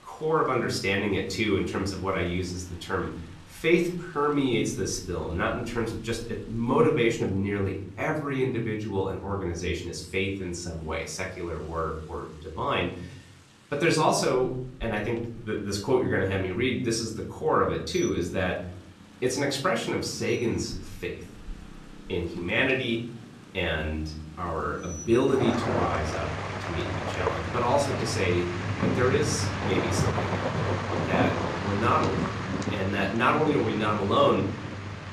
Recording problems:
off-mic speech; far
room echo; slight; dies away in 0.7 s
rain or running water; loud; throughout; 4 dB below the speech

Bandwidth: 13.5 kHz